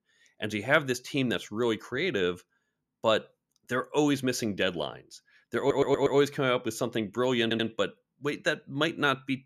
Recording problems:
audio stuttering; at 5.5 s and at 7.5 s

